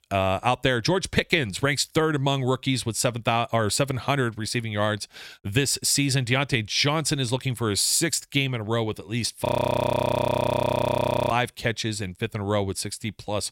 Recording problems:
audio freezing; at 9.5 s for 2 s

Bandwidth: 16 kHz